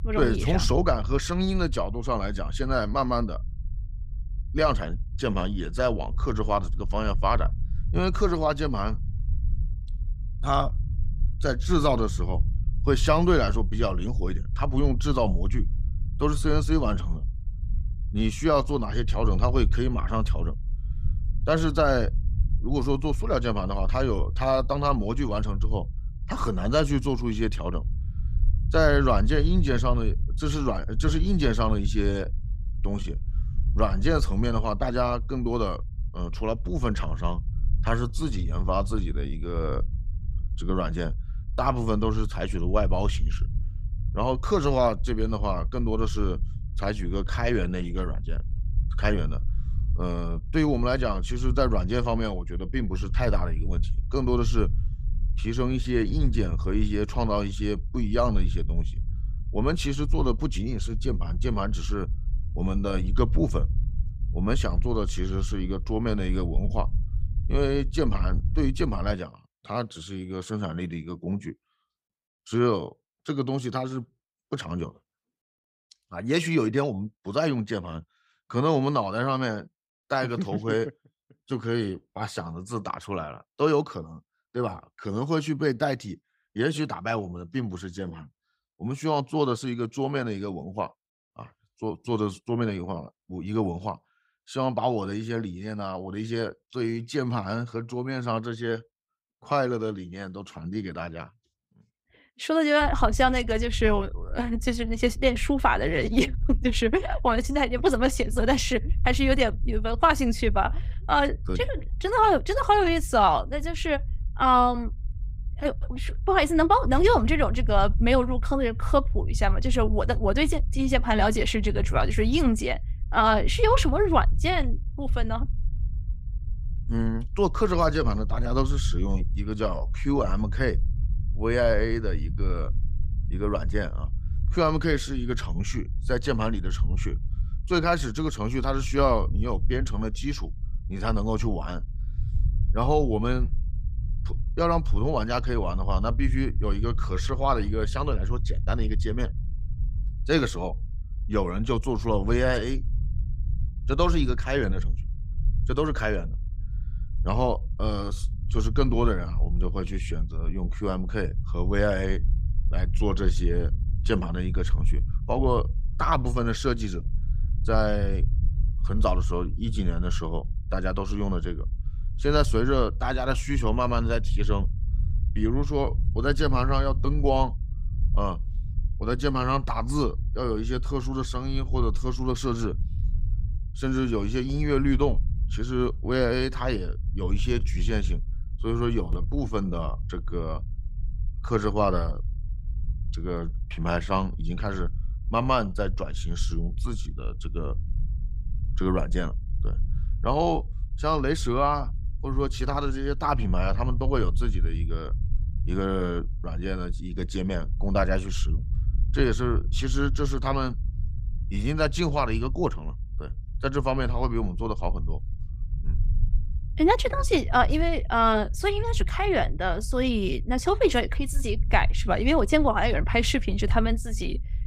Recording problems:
low rumble; faint; until 1:09 and from 1:43 on; 20 dB below the speech

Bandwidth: 15.5 kHz